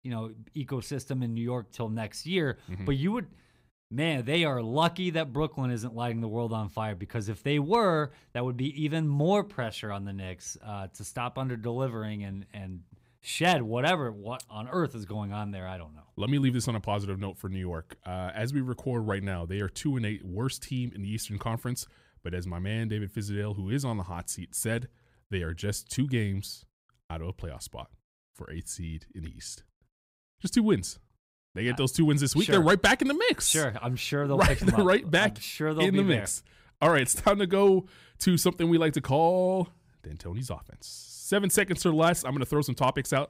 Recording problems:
none

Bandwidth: 15.5 kHz